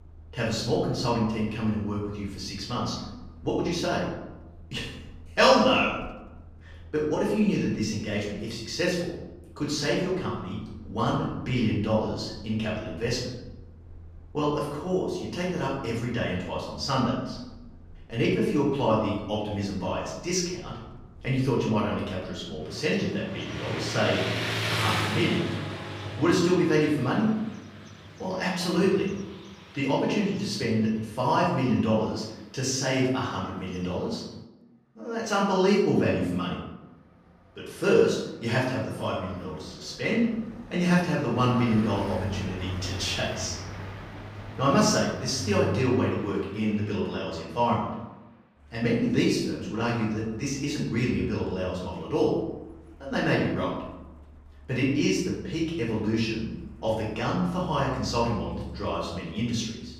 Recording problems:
off-mic speech; far
room echo; noticeable; dies away in 0.8 s
traffic noise; noticeable; throughout; 10 dB below the speech

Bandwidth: 15.5 kHz